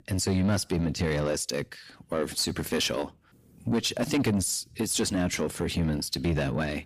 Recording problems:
distortion; slight; 10 dB below the speech

